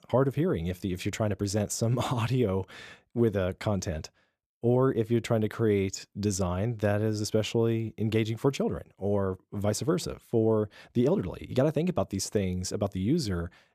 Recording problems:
none

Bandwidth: 14.5 kHz